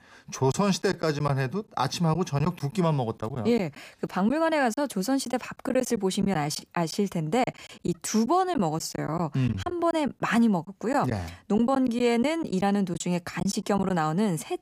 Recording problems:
choppy; very; 6% of the speech affected

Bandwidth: 15 kHz